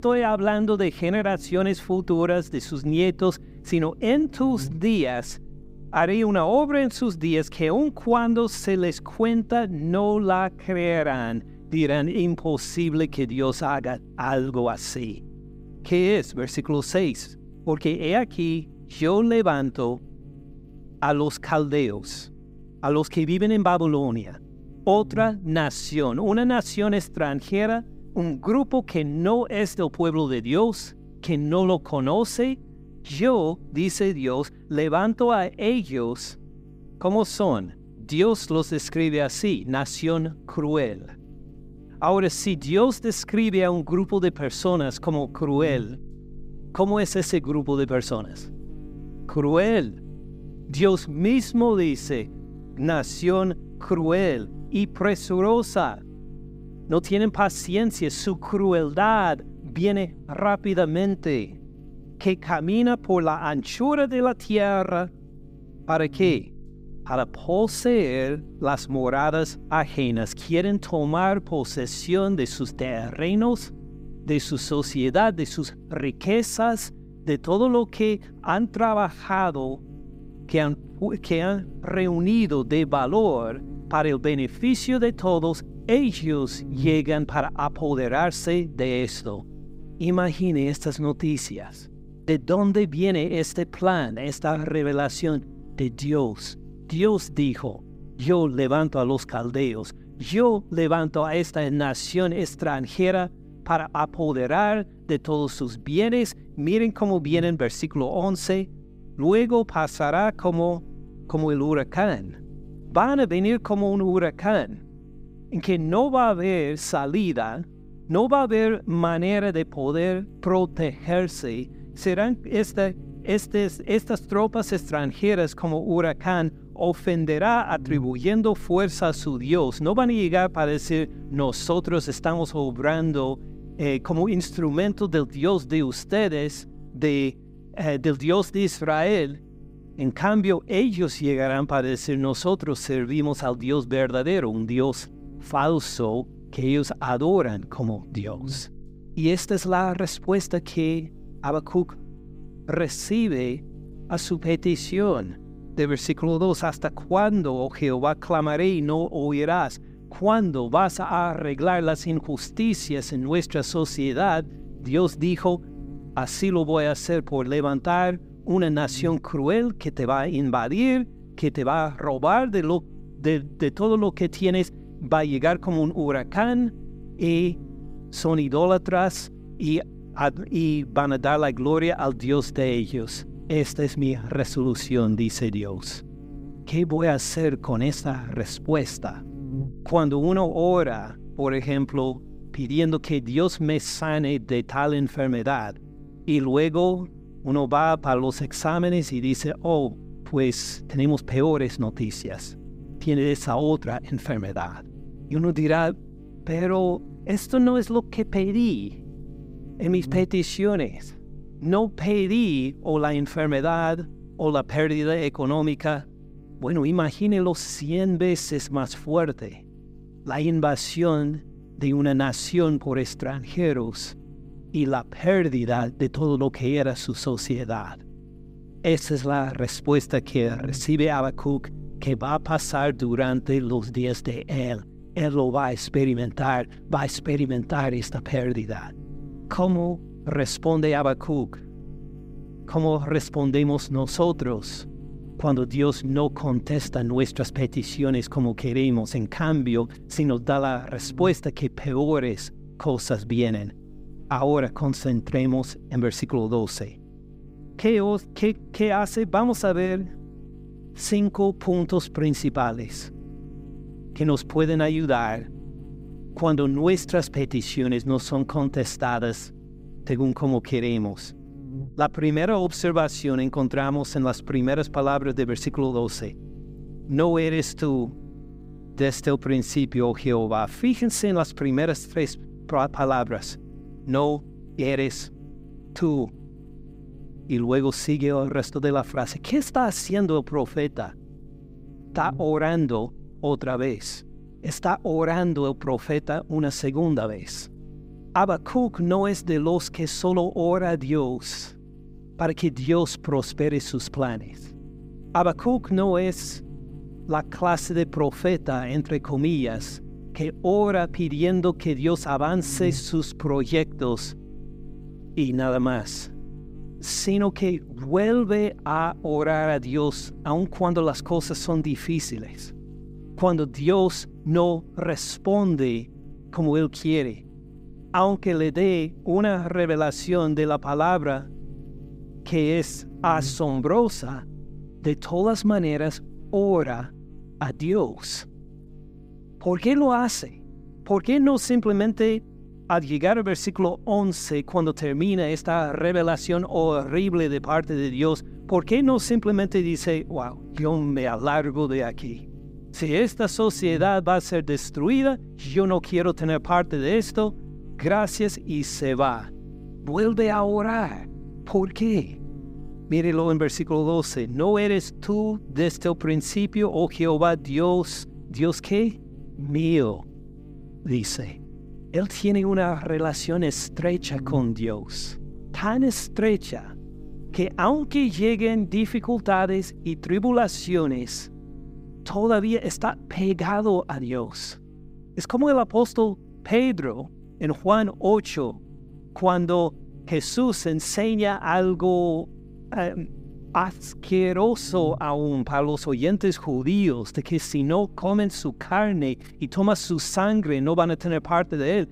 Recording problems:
electrical hum; faint; throughout; 50 Hz, 25 dB below the speech

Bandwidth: 15.5 kHz